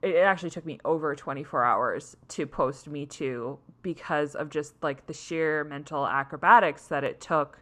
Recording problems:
muffled; slightly; fading above 1.5 kHz

